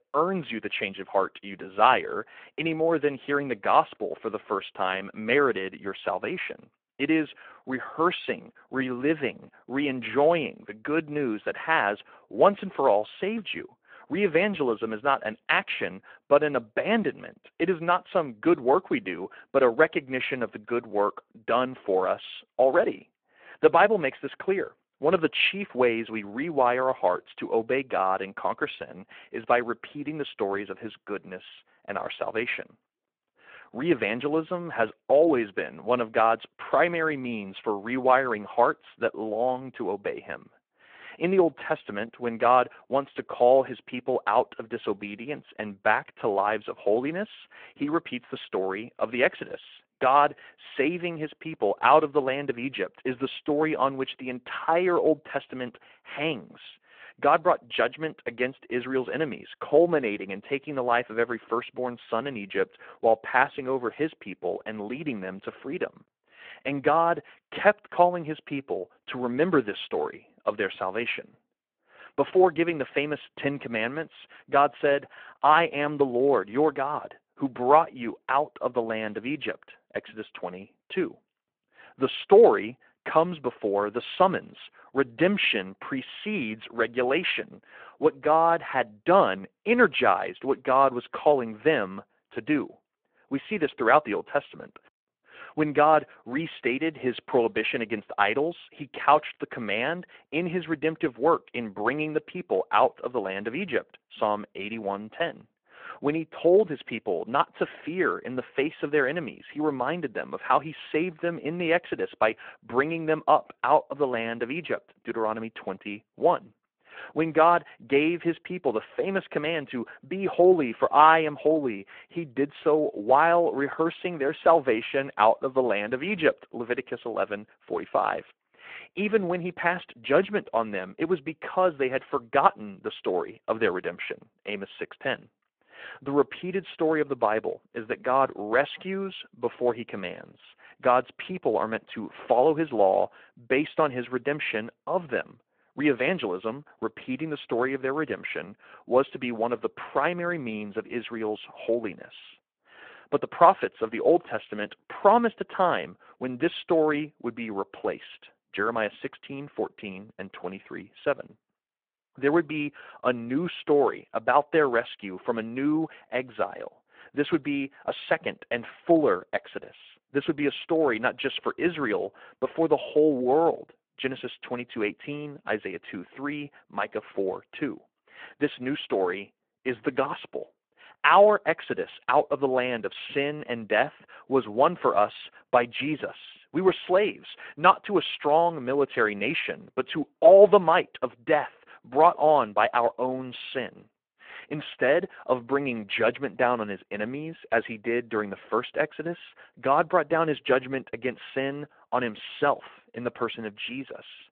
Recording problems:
phone-call audio

